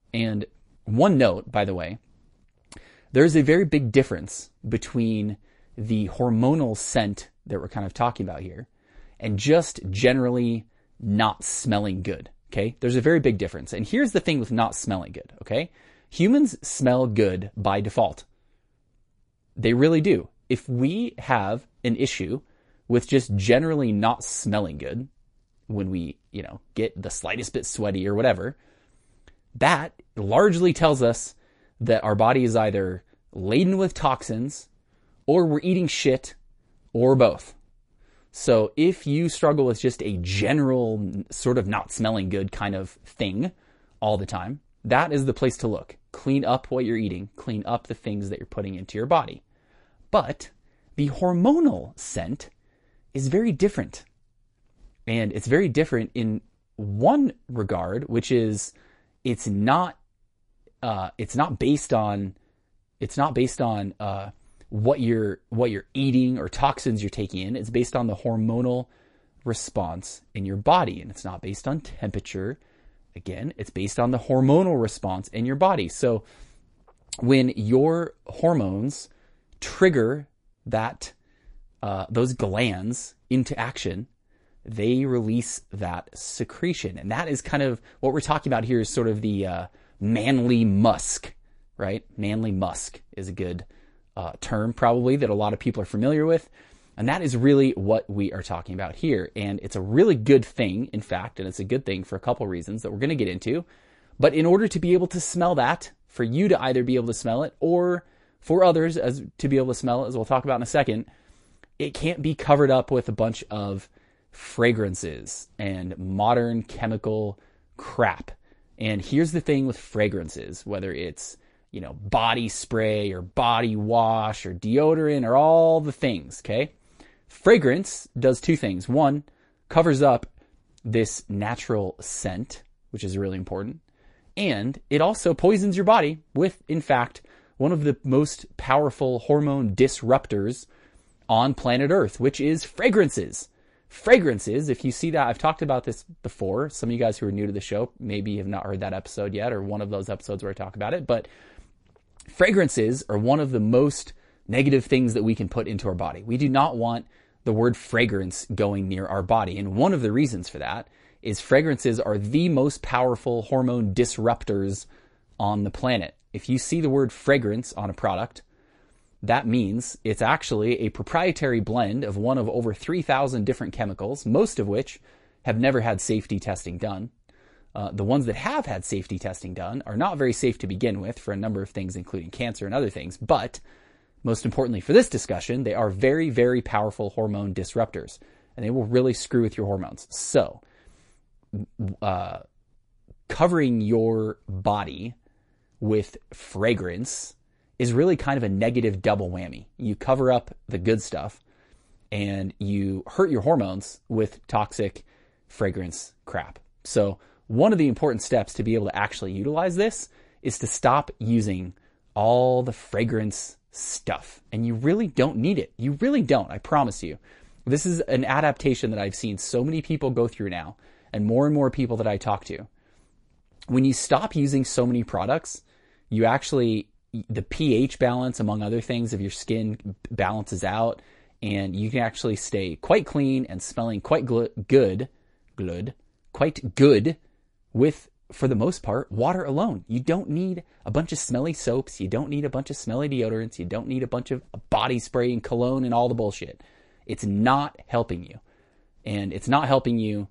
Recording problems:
garbled, watery; slightly; nothing above 10.5 kHz

